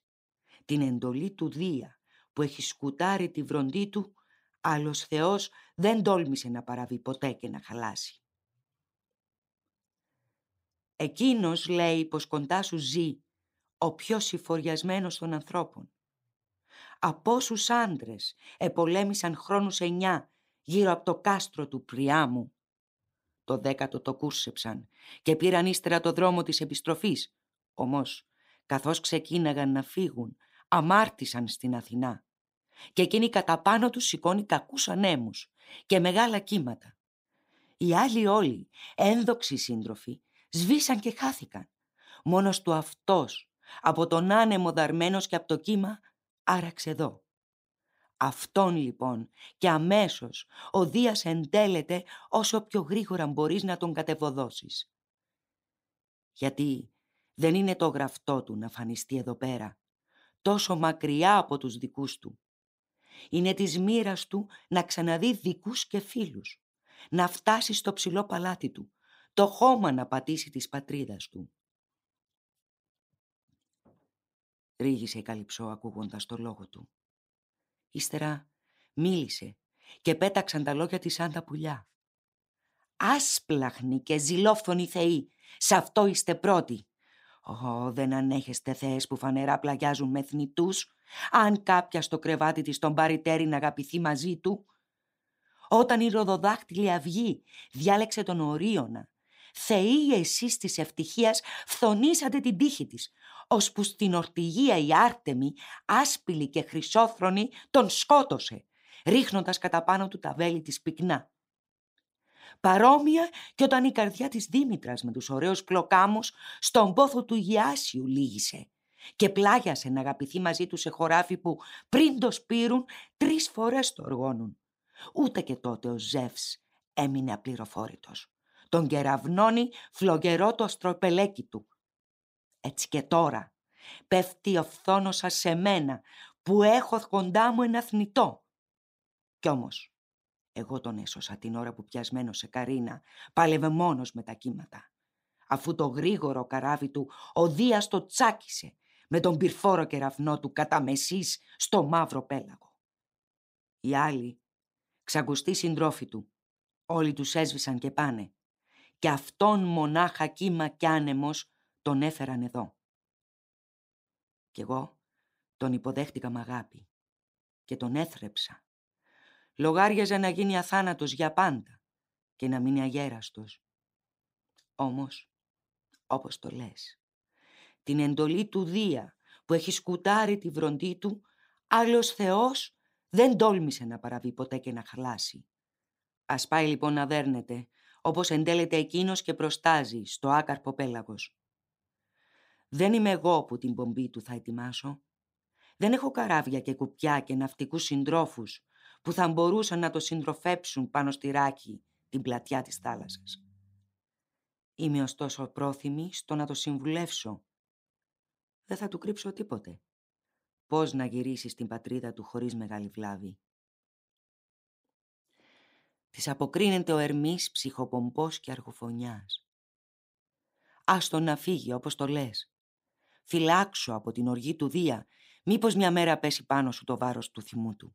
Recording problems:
none

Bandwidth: 15.5 kHz